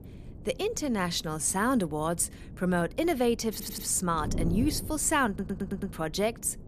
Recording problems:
wind noise on the microphone; occasional gusts; 20 dB below the speech
audio stuttering; at 3.5 s and at 5.5 s

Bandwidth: 14.5 kHz